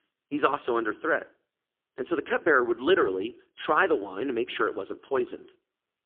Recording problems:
phone-call audio; poor line; nothing above 3.5 kHz

